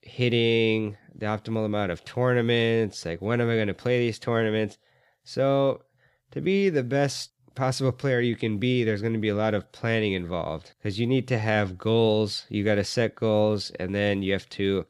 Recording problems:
none

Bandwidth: 15.5 kHz